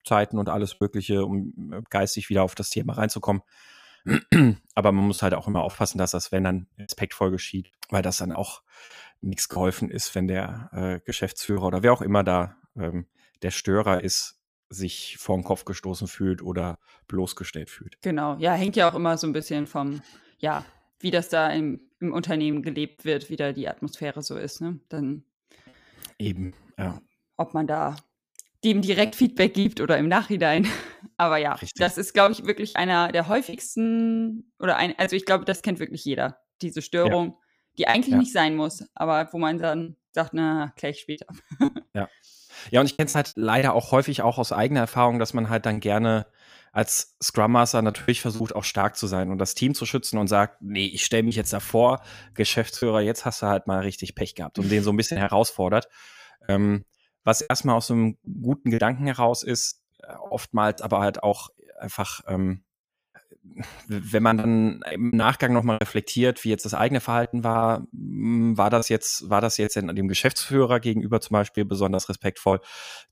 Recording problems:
choppy; very; 6% of the speech affected

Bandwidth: 15 kHz